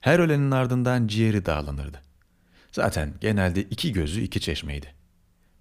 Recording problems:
none

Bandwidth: 15 kHz